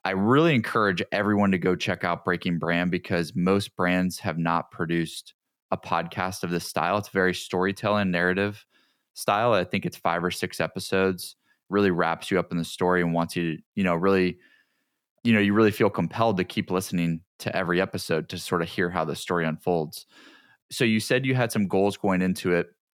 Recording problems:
none

